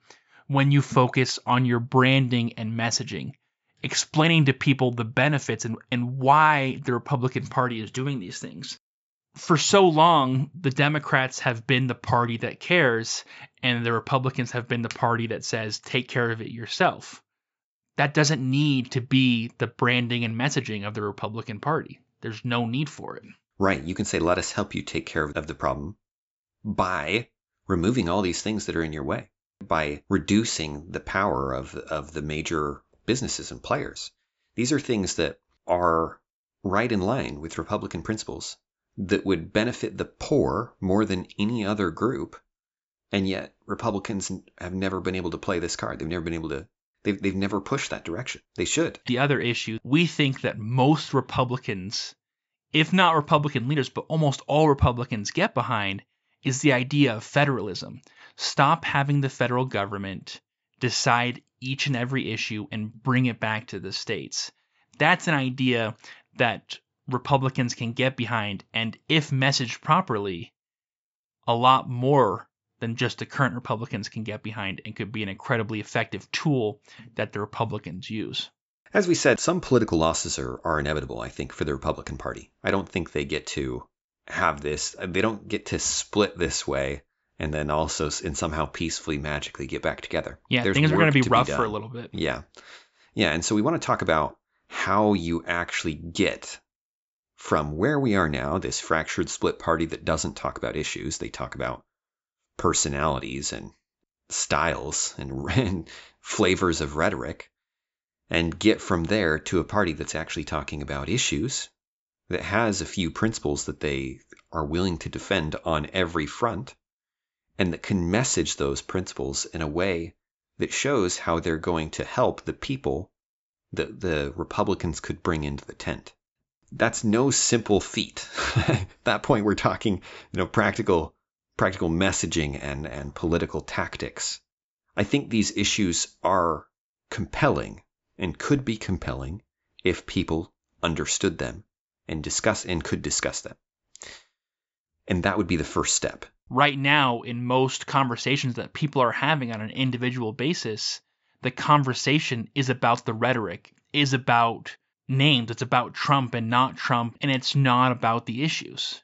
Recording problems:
high frequencies cut off; noticeable; nothing above 8 kHz

